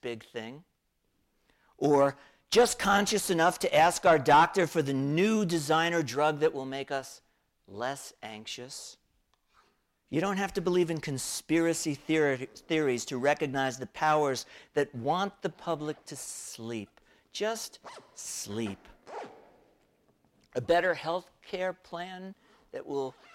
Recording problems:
distortion; slight; 10 dB below the speech
household noises; faint; throughout; 25 dB below the speech

